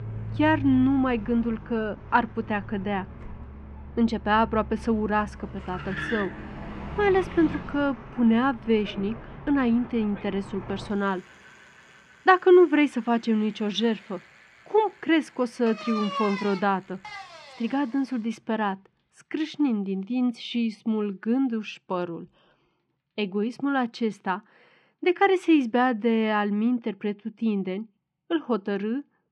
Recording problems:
muffled; slightly; fading above 2.5 kHz
traffic noise; noticeable; throughout; 15 dB below the speech

